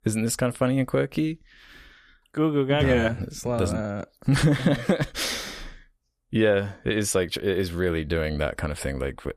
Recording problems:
none

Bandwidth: 14.5 kHz